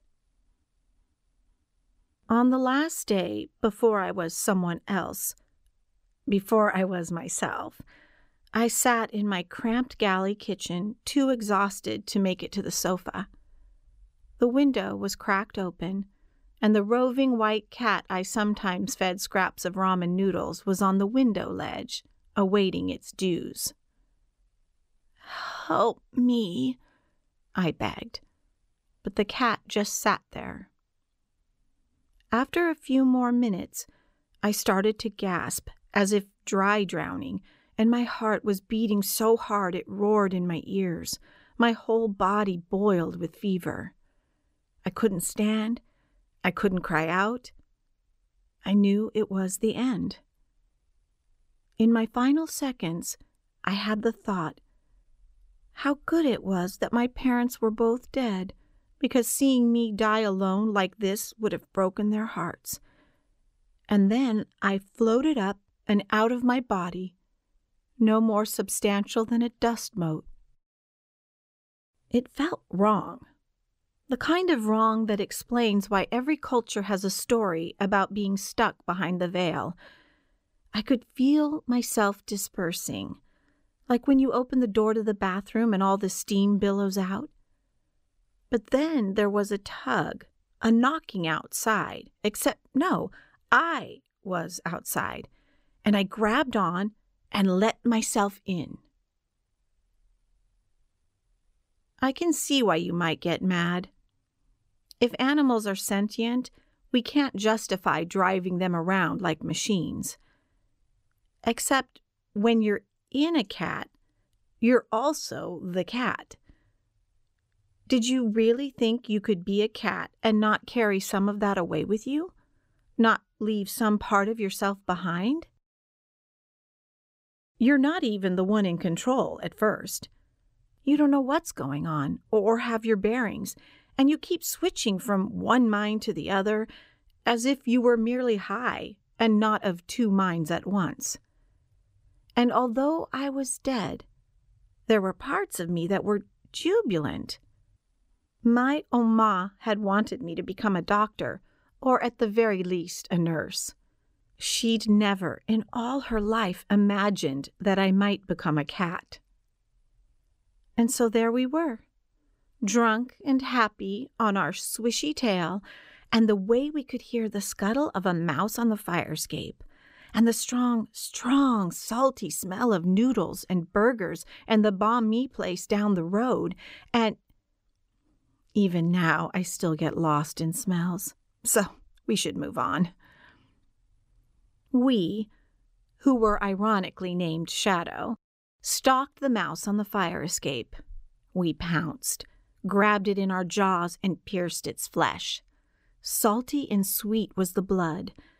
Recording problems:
none

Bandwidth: 15.5 kHz